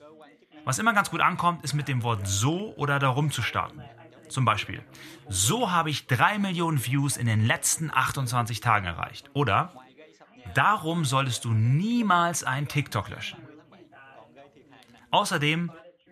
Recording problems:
background chatter; faint; throughout; 3 voices, 25 dB below the speech

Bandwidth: 14 kHz